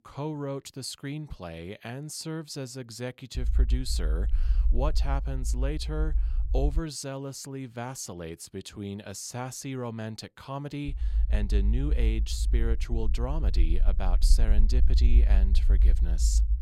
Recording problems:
low rumble; noticeable; from 3.5 to 7 s and from 11 s on; 10 dB below the speech

